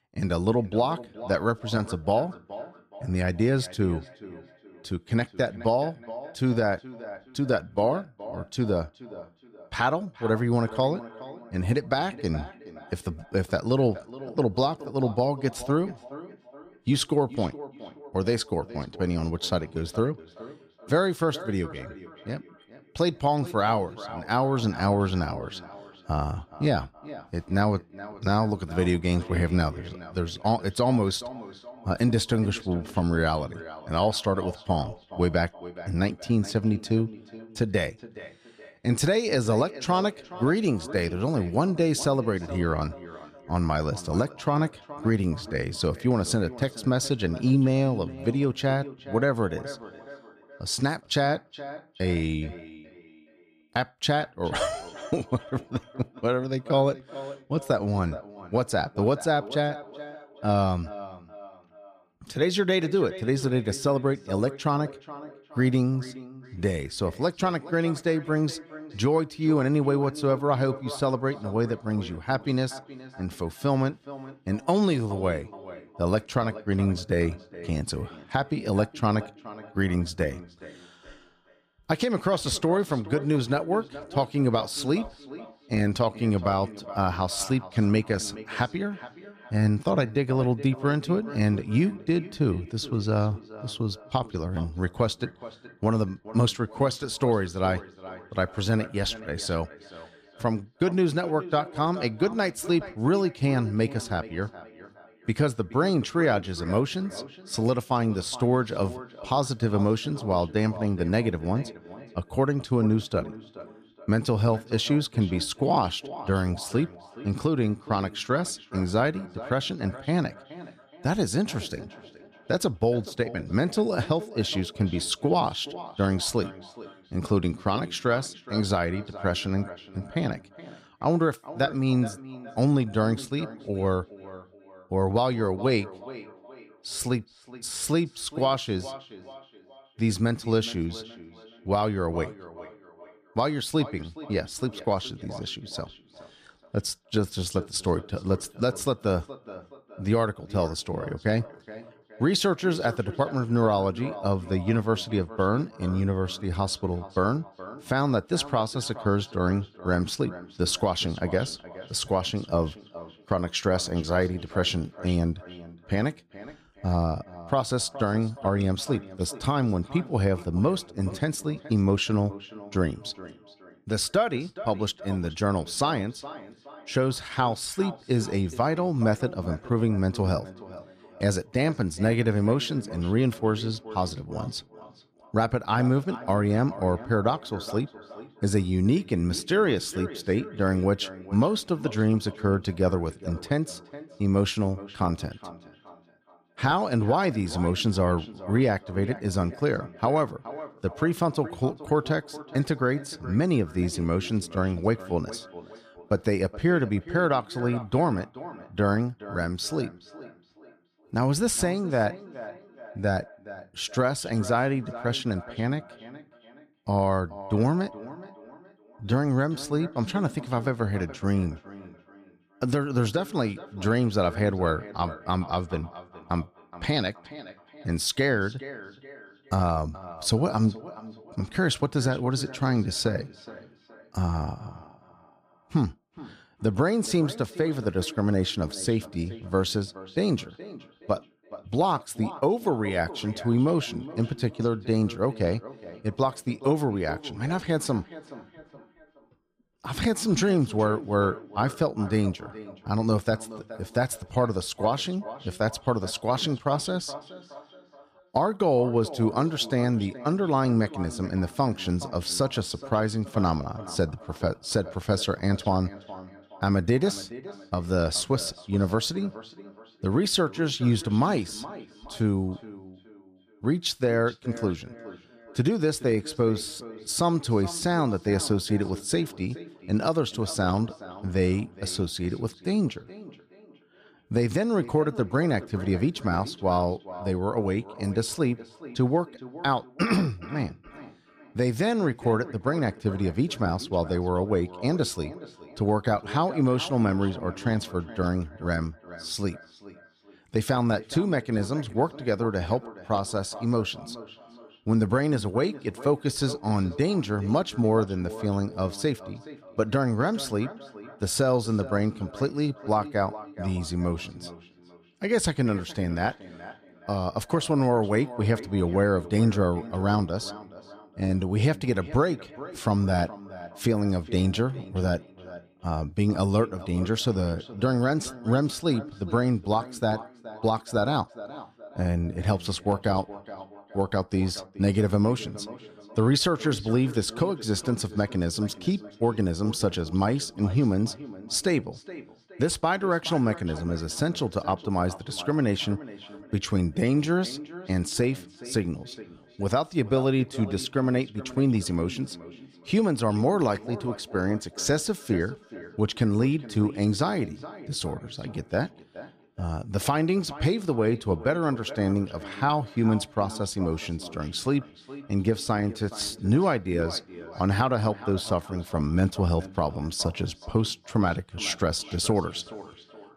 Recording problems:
echo of what is said; noticeable; throughout; 420 ms later, 15 dB below the speech

